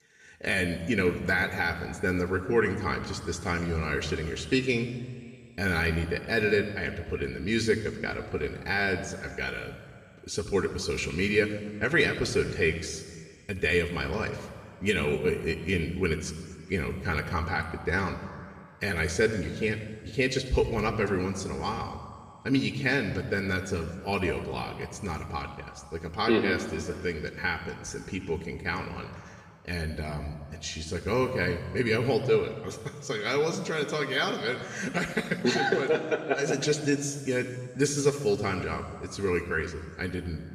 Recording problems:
room echo; noticeable; dies away in 1.8 s
off-mic speech; somewhat distant

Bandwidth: 15 kHz